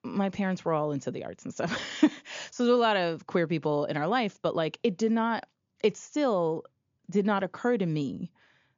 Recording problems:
high frequencies cut off; noticeable; nothing above 7 kHz

